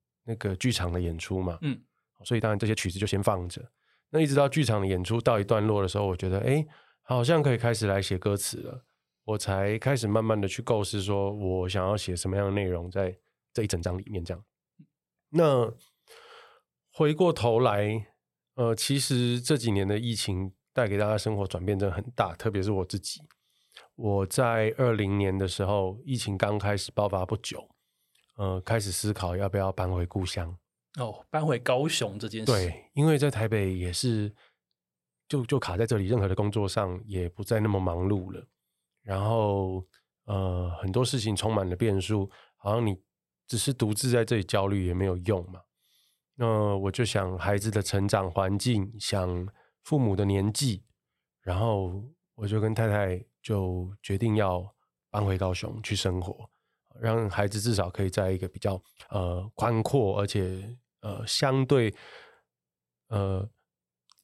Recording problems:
uneven, jittery; strongly; from 2 s to 1:00

